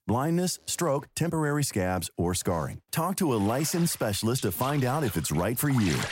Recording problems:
household noises; noticeable; throughout; 15 dB below the speech

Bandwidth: 16 kHz